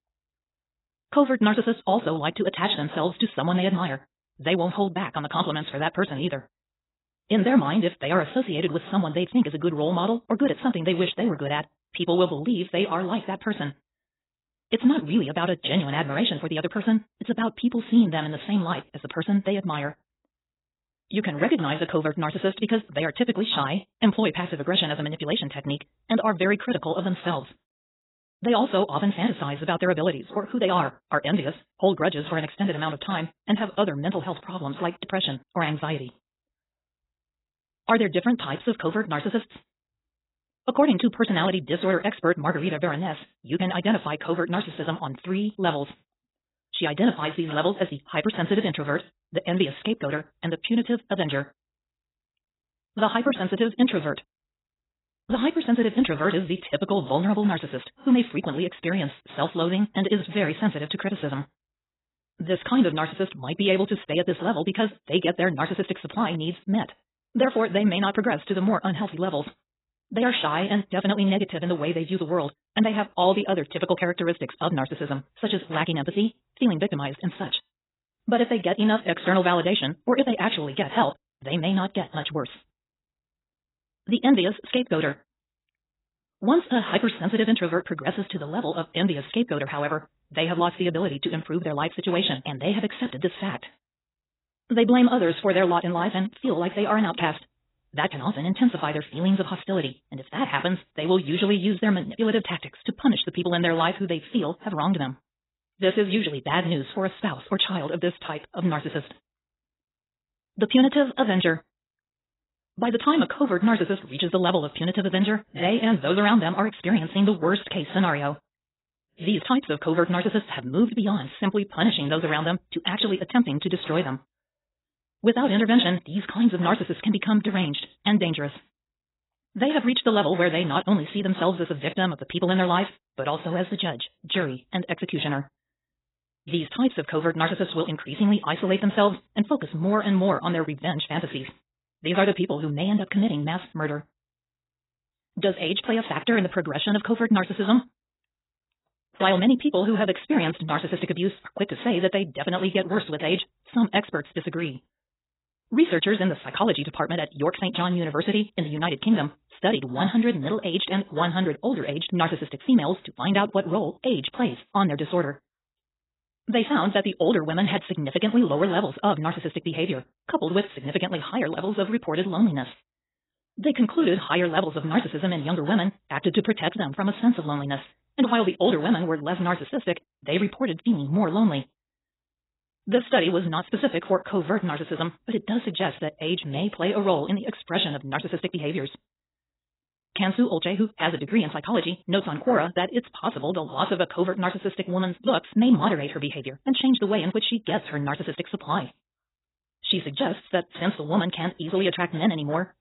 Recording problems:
garbled, watery; badly; nothing above 4 kHz
wrong speed, natural pitch; too fast; 1.8 times normal speed

